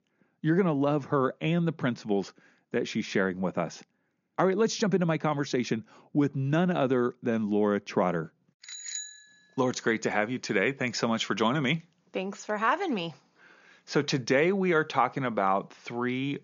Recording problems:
high frequencies cut off; noticeable; nothing above 7 kHz

